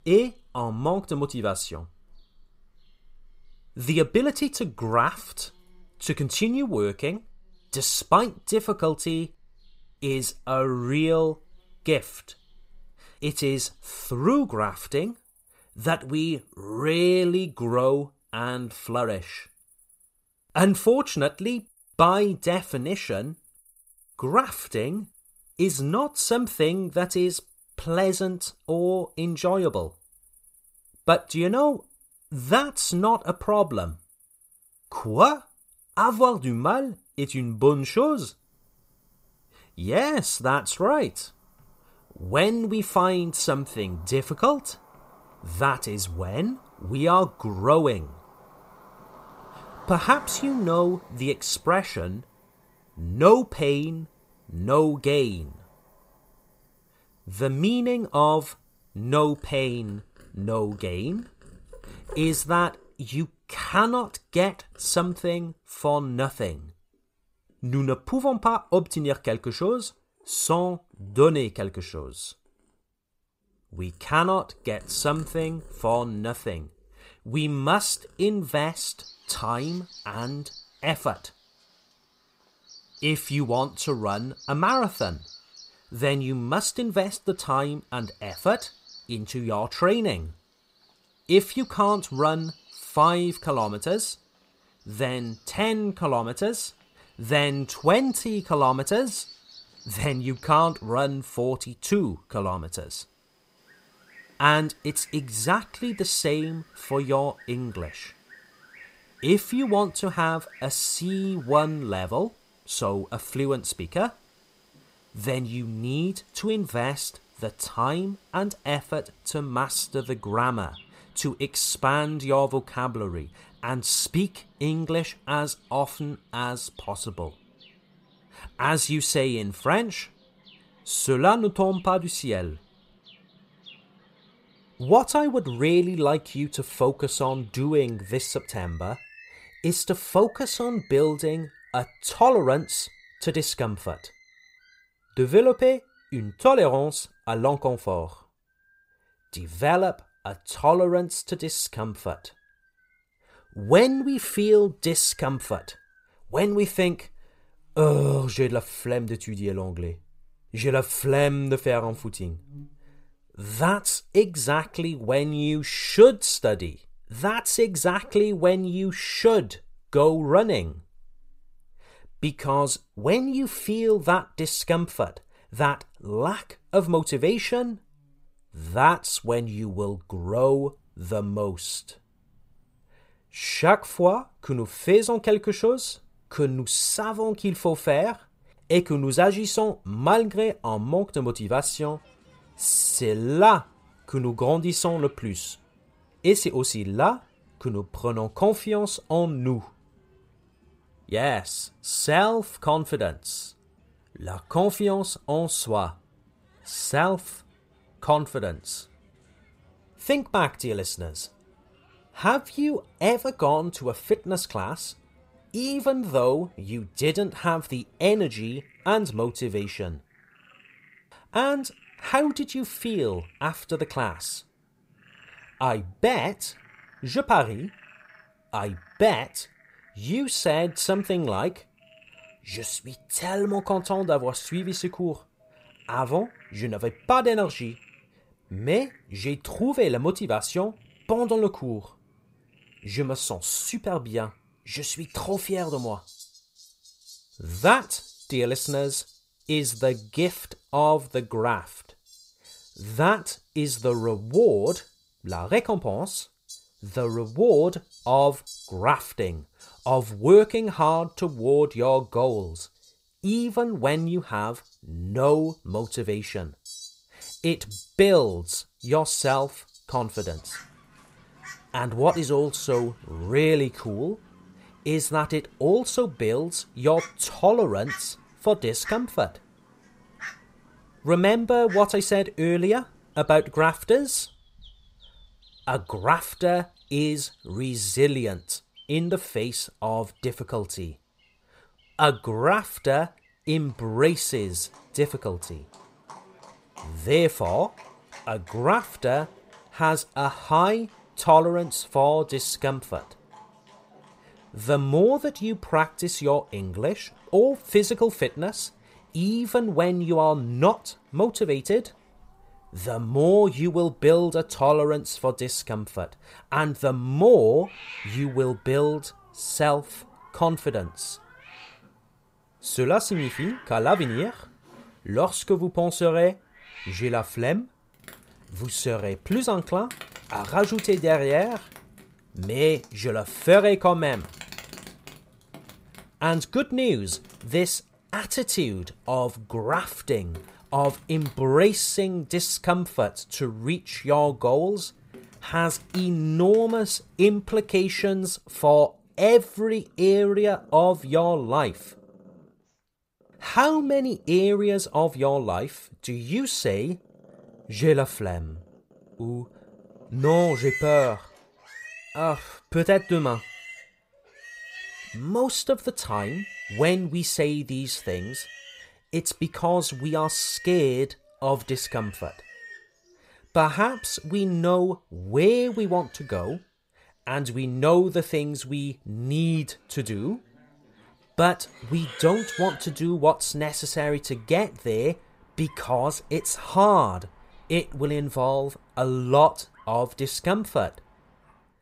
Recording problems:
animal sounds; faint; throughout; 25 dB below the speech

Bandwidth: 15.5 kHz